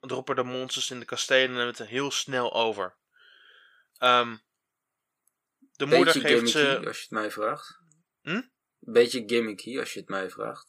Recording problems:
thin; somewhat; fading below 800 Hz

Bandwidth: 15 kHz